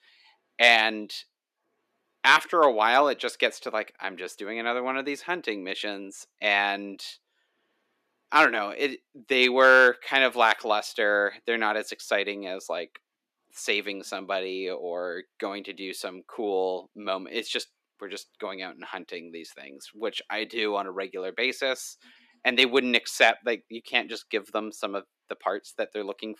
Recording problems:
thin; somewhat; fading below 250 Hz

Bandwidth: 14.5 kHz